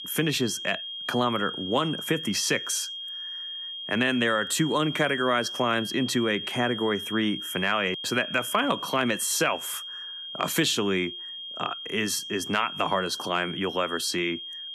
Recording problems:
high-pitched whine; loud; throughout; 3 kHz, 7 dB below the speech

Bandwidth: 13.5 kHz